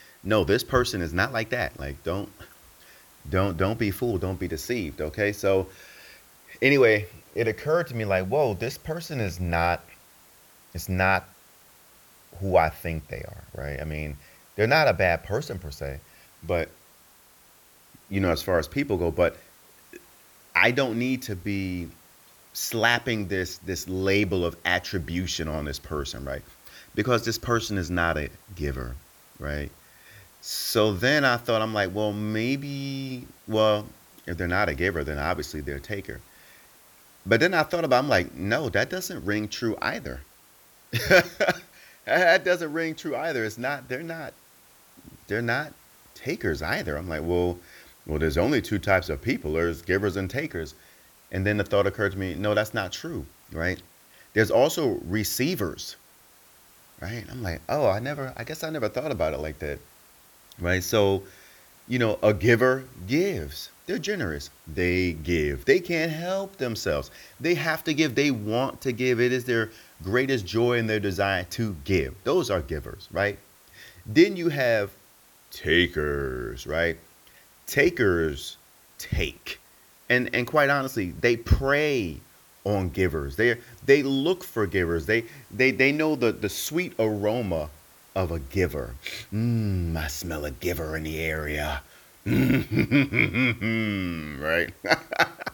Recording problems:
hiss; faint; throughout; 25 dB below the speech

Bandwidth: 18.5 kHz